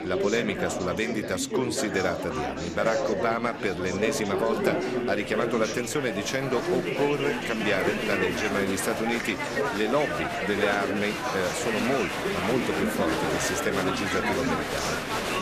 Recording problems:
murmuring crowd; very loud; throughout; as loud as the speech

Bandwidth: 14.5 kHz